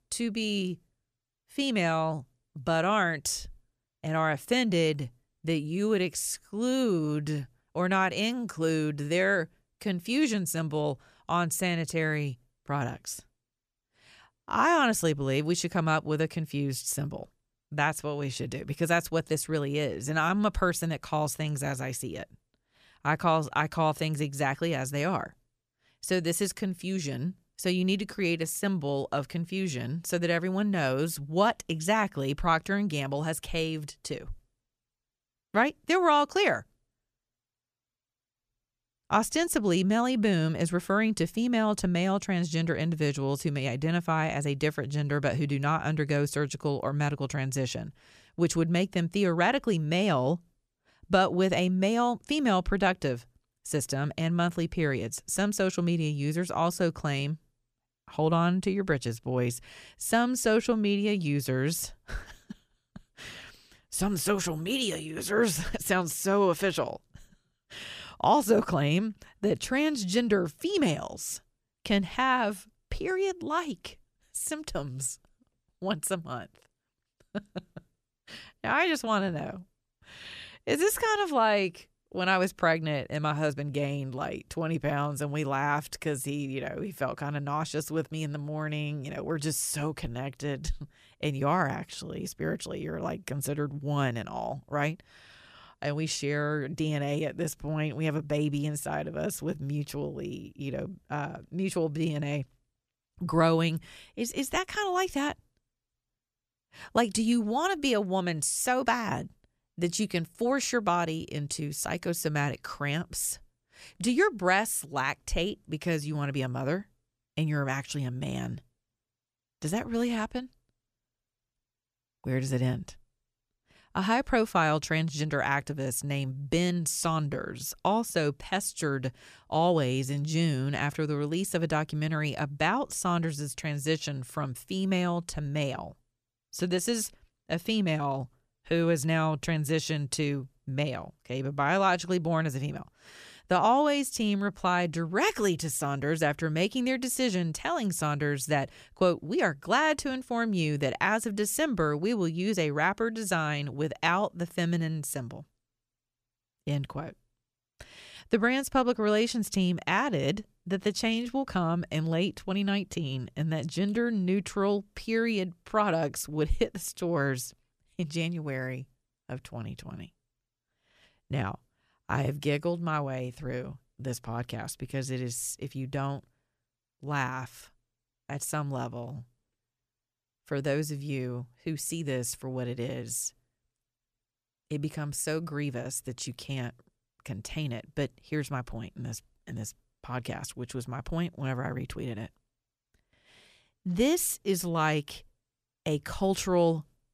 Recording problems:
none

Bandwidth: 14.5 kHz